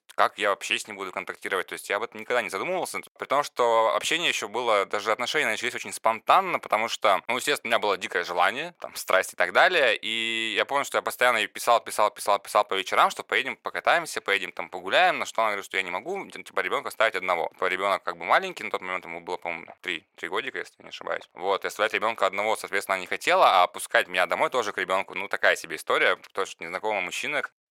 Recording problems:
thin; very; fading below 650 Hz

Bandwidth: 16 kHz